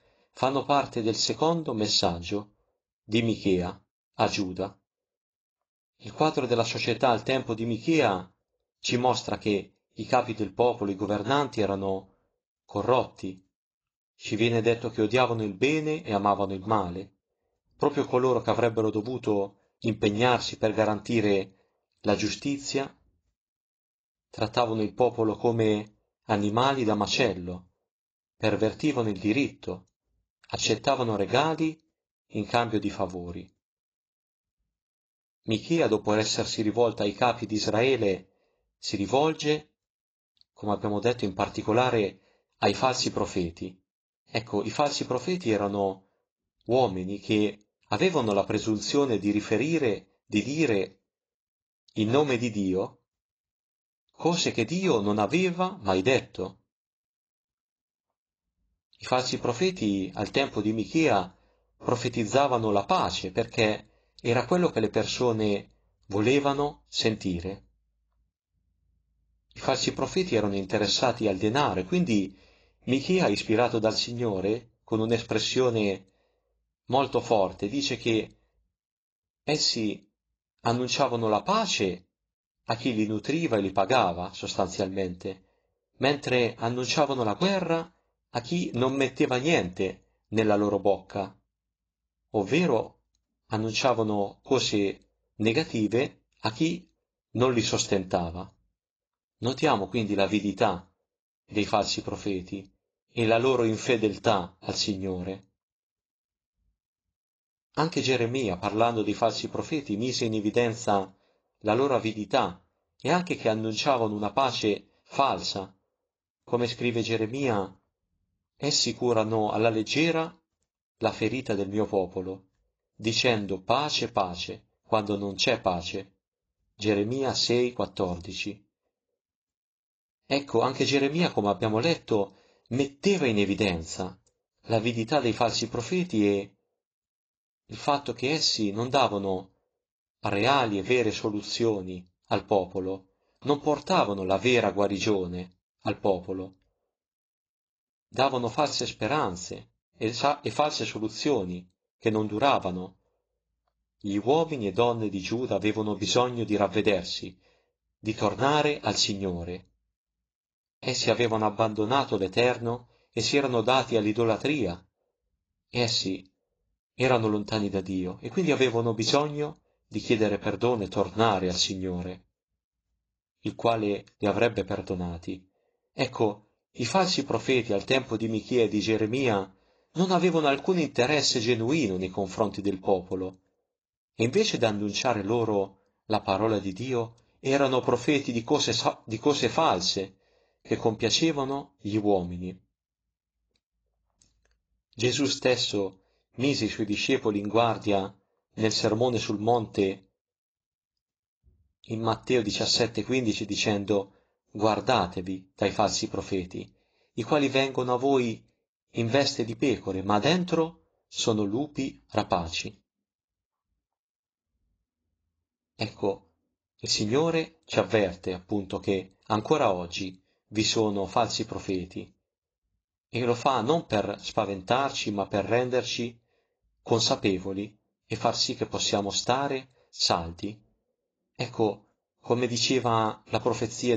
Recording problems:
garbled, watery; badly
abrupt cut into speech; at the end

